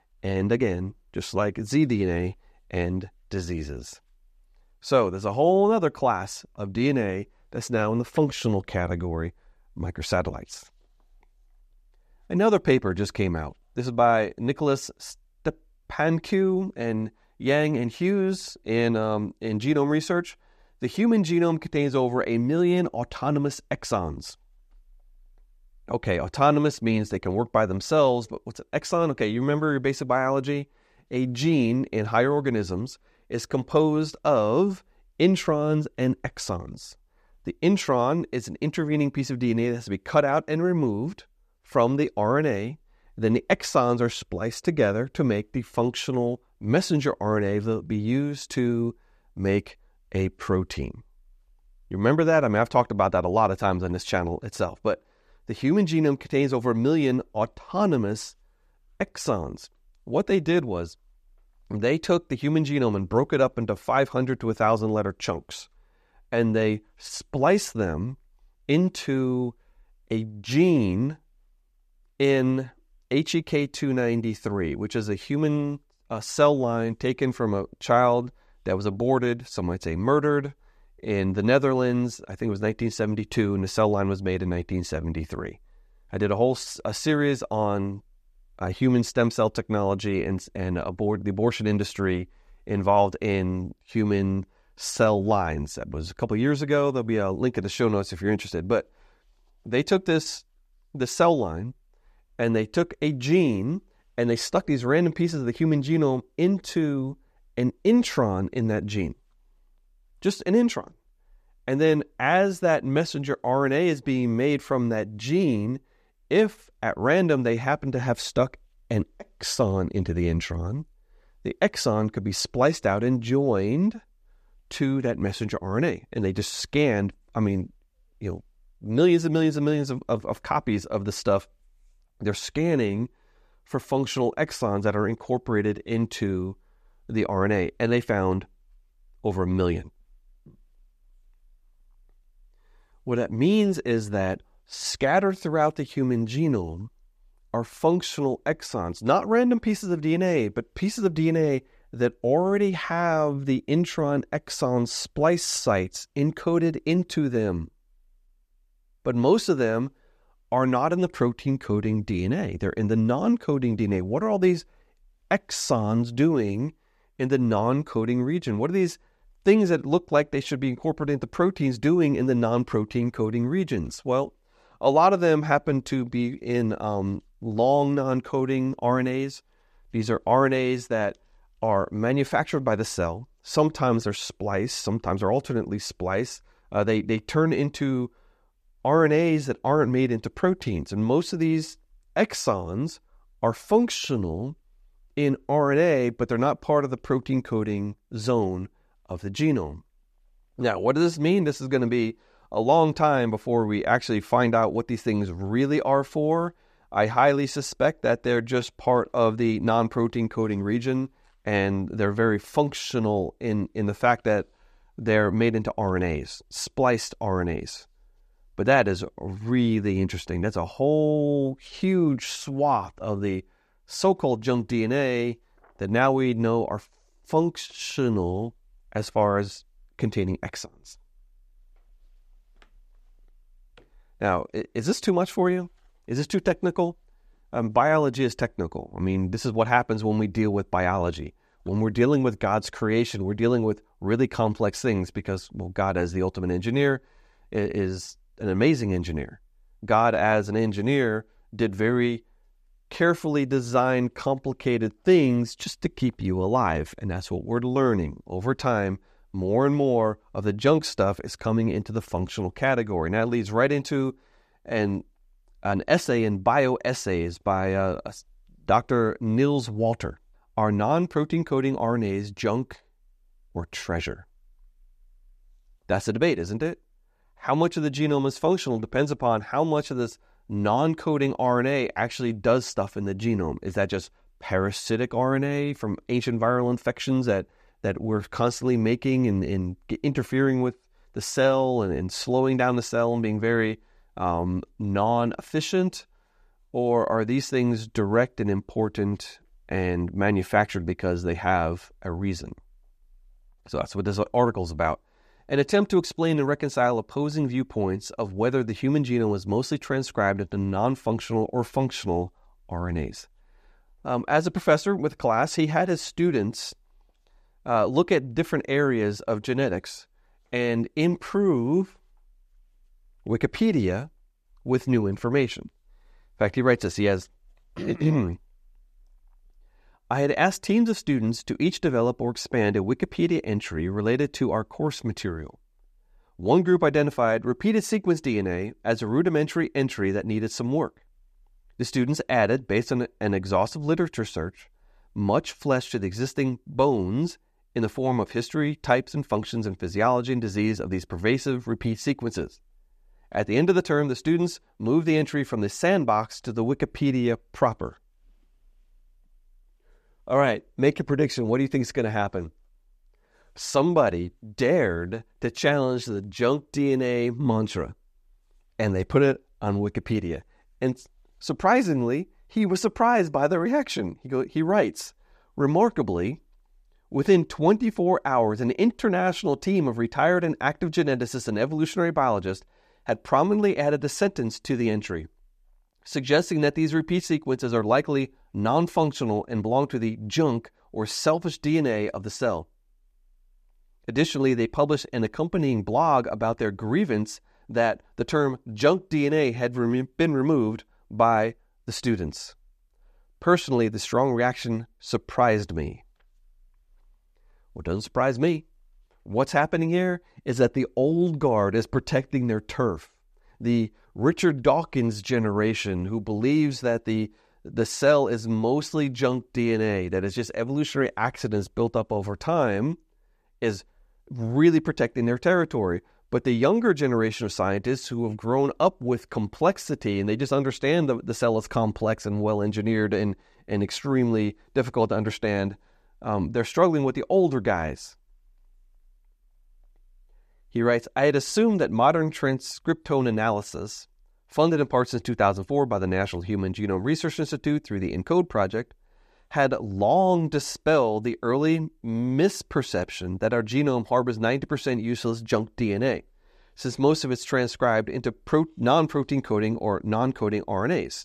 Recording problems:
none

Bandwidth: 14.5 kHz